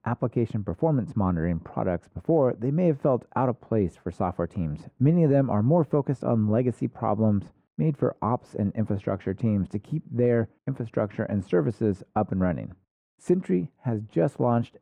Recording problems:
muffled; very; fading above 3 kHz

